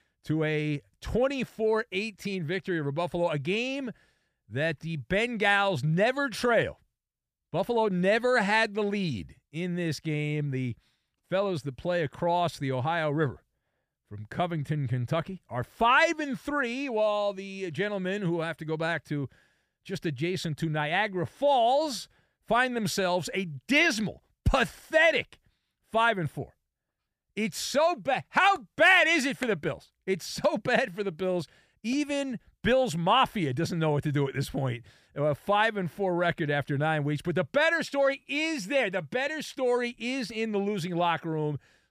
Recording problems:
none

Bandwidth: 15 kHz